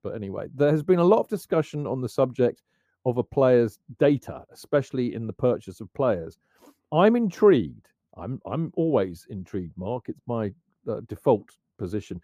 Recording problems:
muffled; very; fading above 1.5 kHz

